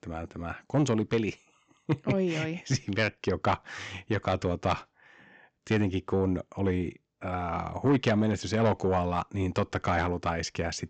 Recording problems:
high frequencies cut off; noticeable; nothing above 8 kHz
distortion; slight; 10 dB below the speech

